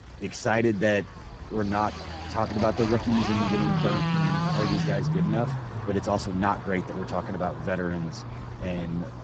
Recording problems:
garbled, watery; badly; nothing above 7.5 kHz
traffic noise; loud; throughout; 7 dB below the speech
murmuring crowd; noticeable; throughout; 20 dB below the speech
low rumble; noticeable; throughout; 10 dB below the speech
electrical hum; faint; from 2.5 s on; 60 Hz, 20 dB below the speech

